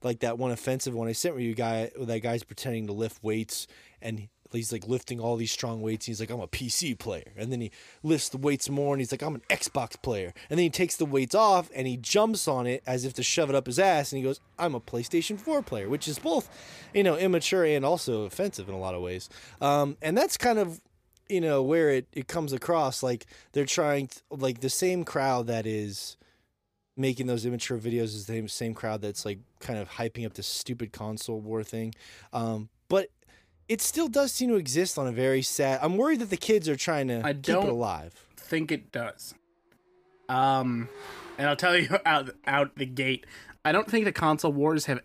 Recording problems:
traffic noise; faint; throughout; 30 dB below the speech

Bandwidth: 15 kHz